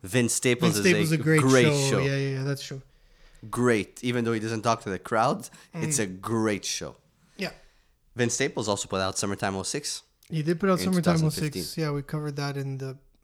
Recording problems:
none

